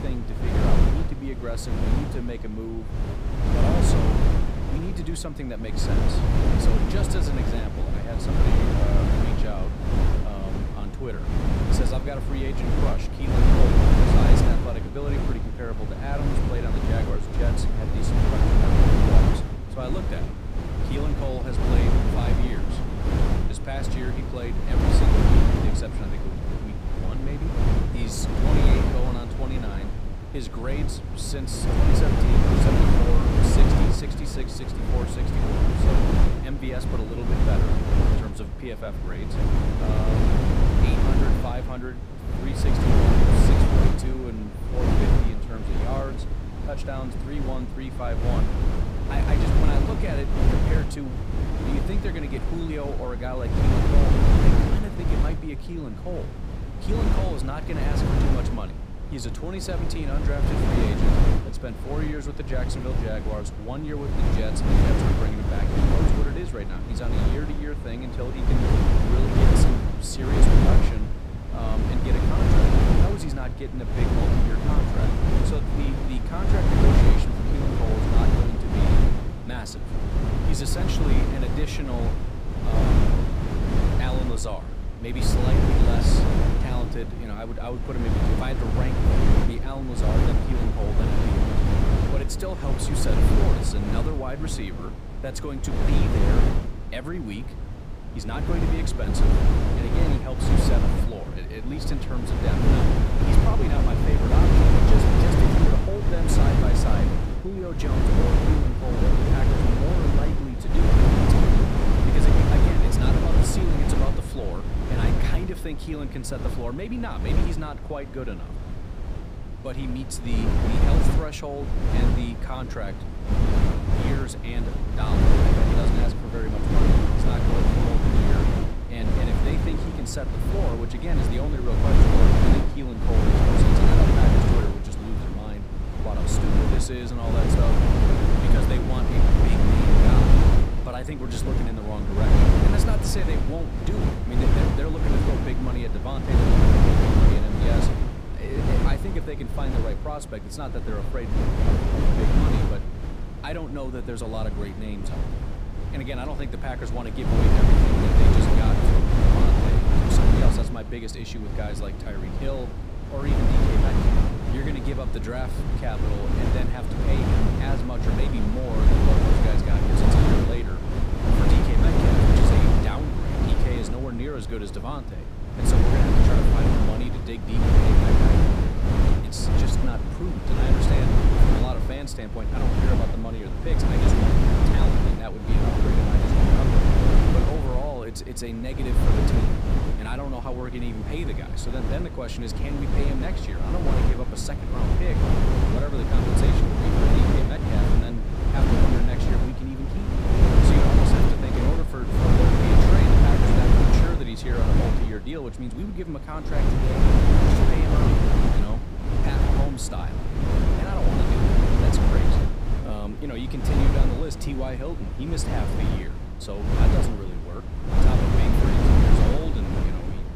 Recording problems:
wind noise on the microphone; heavy; 4 dB above the speech

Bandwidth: 15 kHz